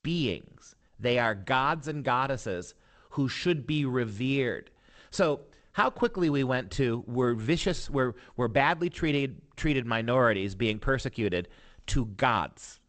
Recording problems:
garbled, watery; slightly; nothing above 8 kHz

